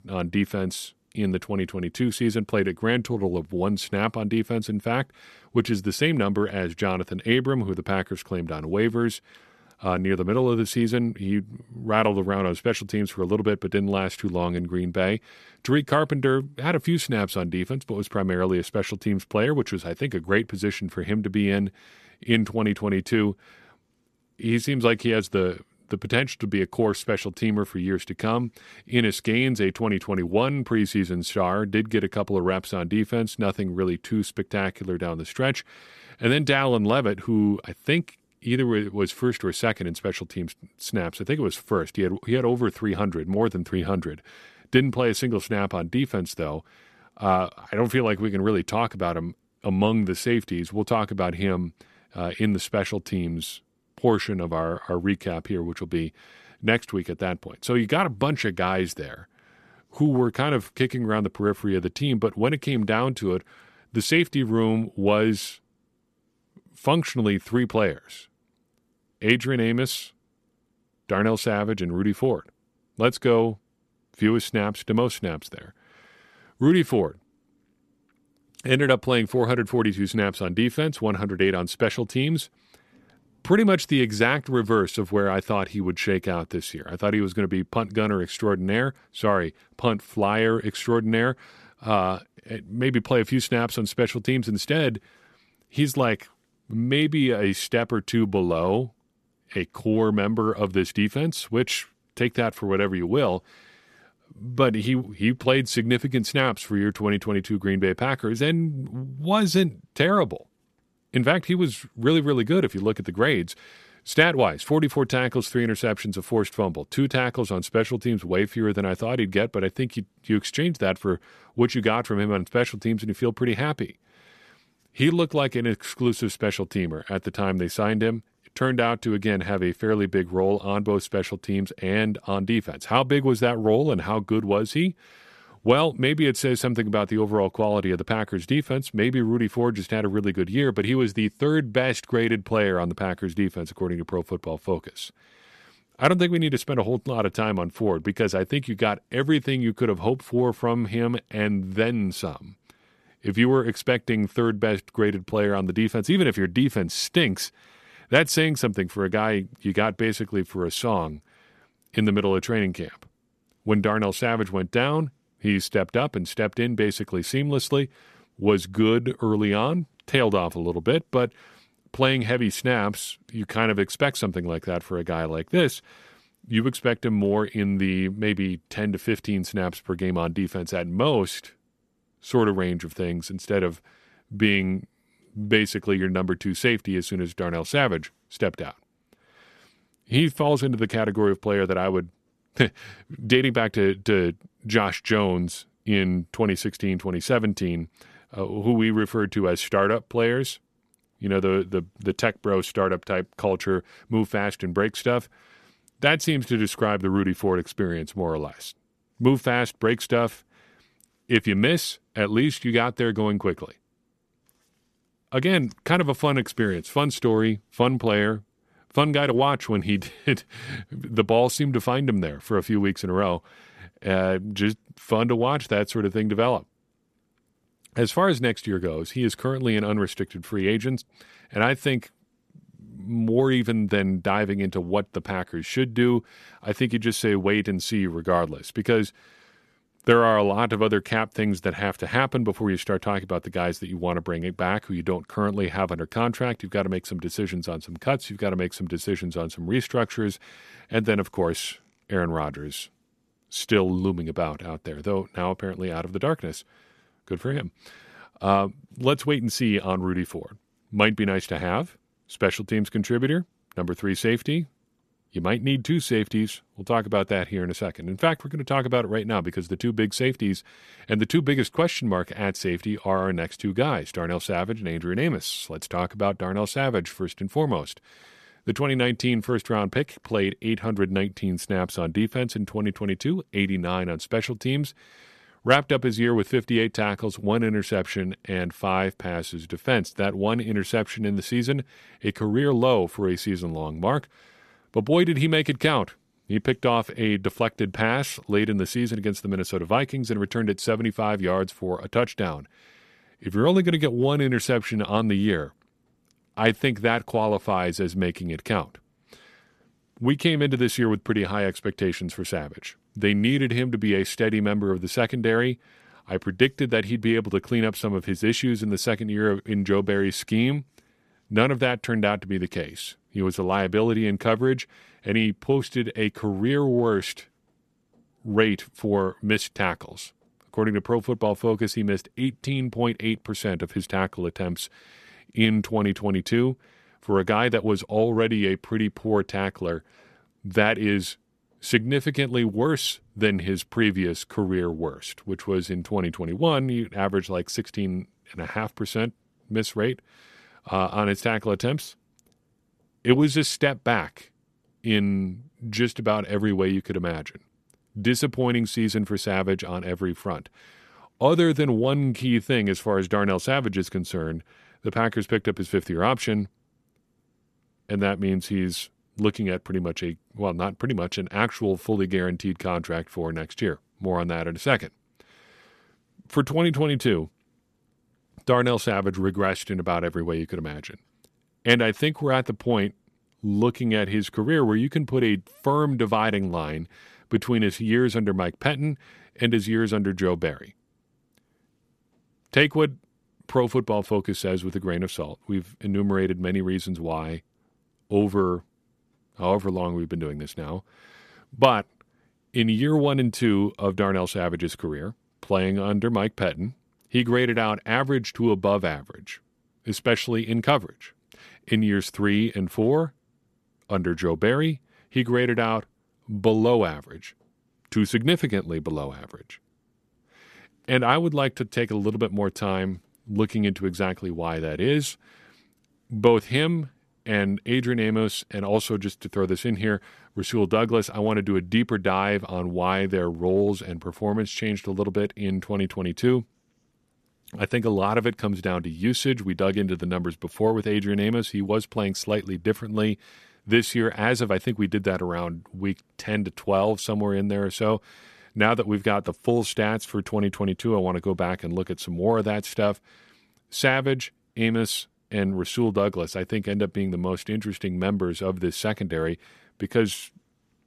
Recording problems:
none

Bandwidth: 14 kHz